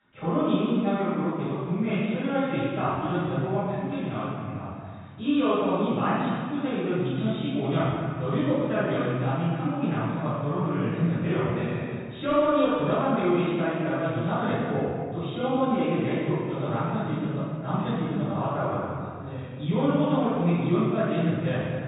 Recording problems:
room echo; strong; dies away in 2 s
off-mic speech; far
high frequencies cut off; severe; nothing above 4 kHz

